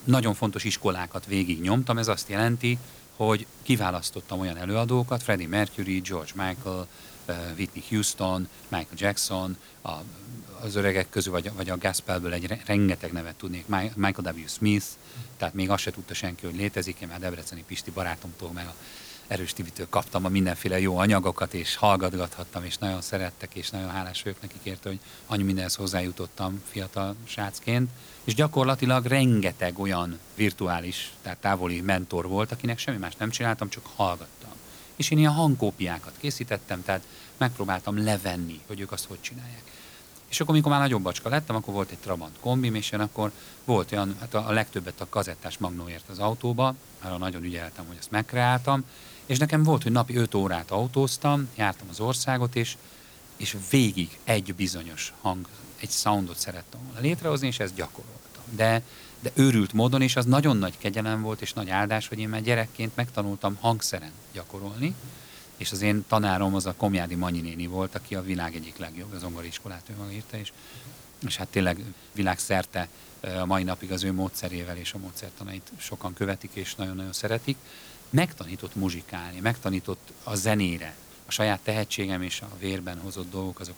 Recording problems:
hiss; noticeable; throughout; 20 dB below the speech

